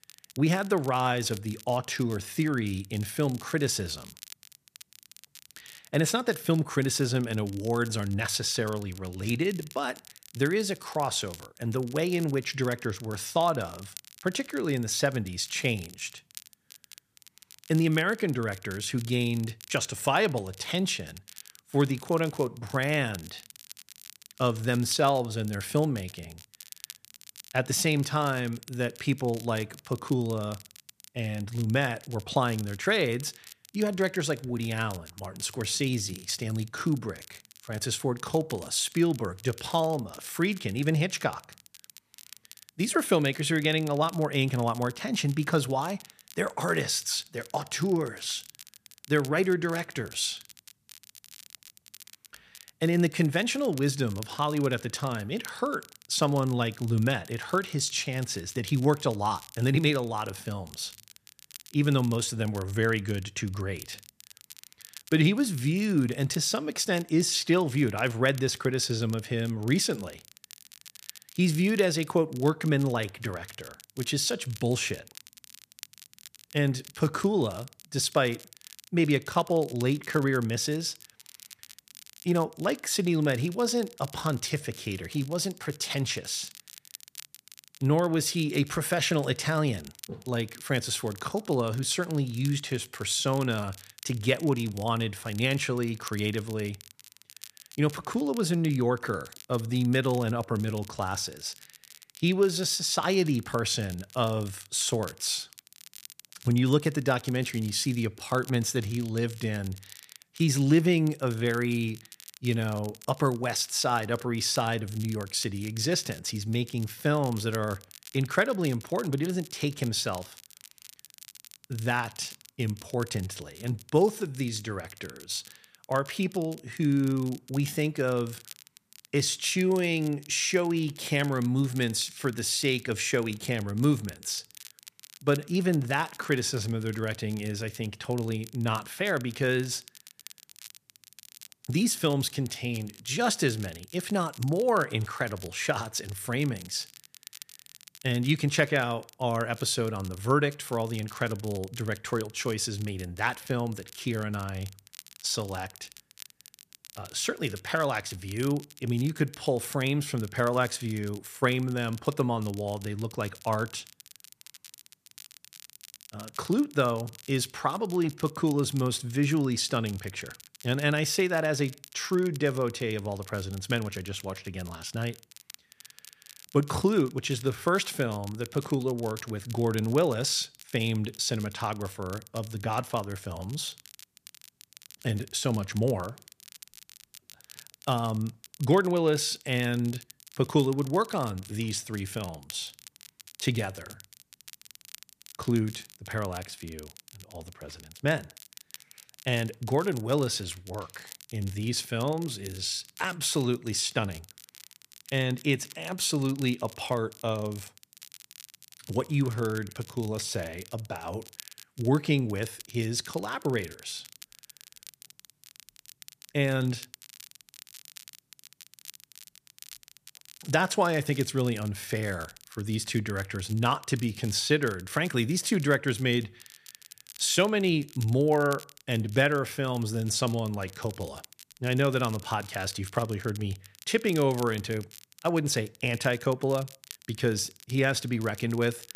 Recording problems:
crackle, like an old record; noticeable; 20 dB below the speech

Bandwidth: 14.5 kHz